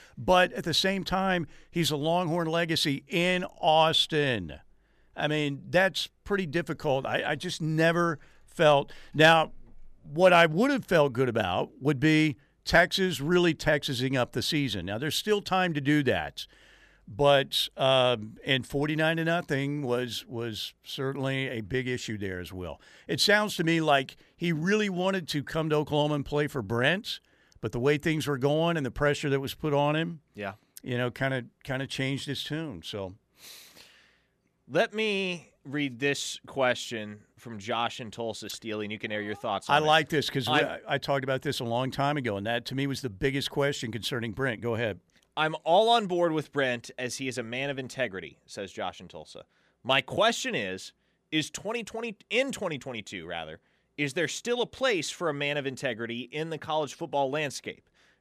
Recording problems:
none

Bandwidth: 14.5 kHz